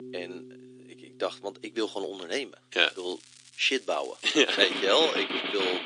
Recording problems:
thin; somewhat; fading below 300 Hz
garbled, watery; slightly
background music; loud; throughout; 5 dB below the speech
crackling; faint; from 3 to 5 s; 25 dB below the speech

